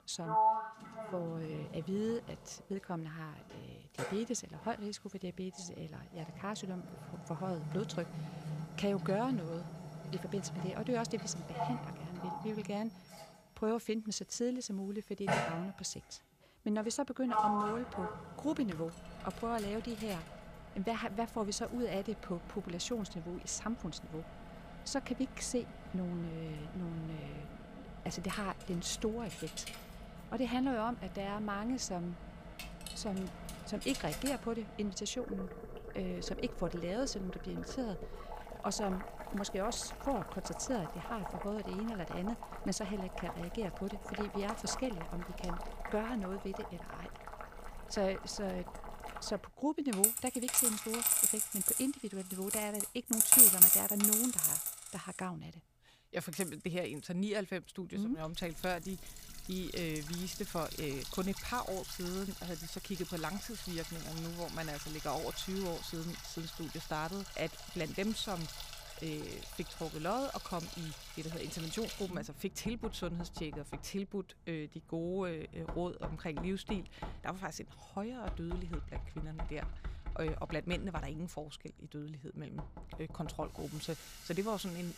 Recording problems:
household noises; very loud; throughout; 4 dB above the speech

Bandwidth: 15 kHz